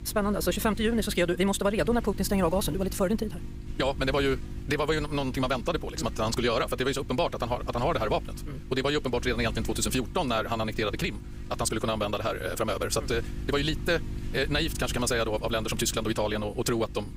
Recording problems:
wrong speed, natural pitch; too fast; 1.7 times normal speed
electrical hum; noticeable; throughout; 50 Hz, 20 dB below the speech

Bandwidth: 15.5 kHz